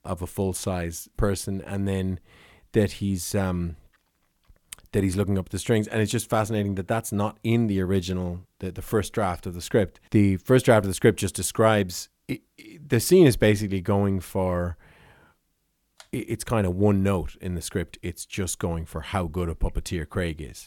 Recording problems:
none

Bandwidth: 17 kHz